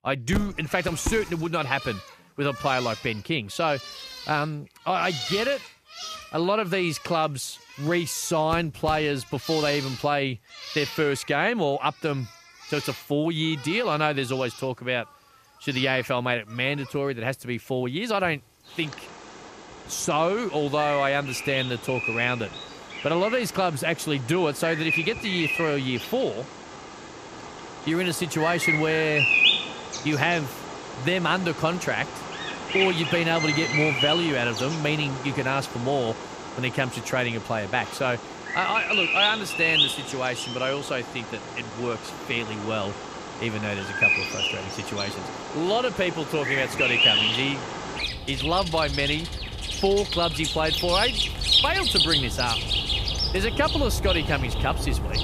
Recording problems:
animal sounds; loud; throughout; as loud as the speech

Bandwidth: 14.5 kHz